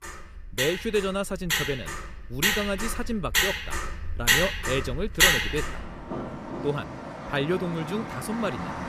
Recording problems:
traffic noise; very loud; throughout; 3 dB above the speech

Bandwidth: 15 kHz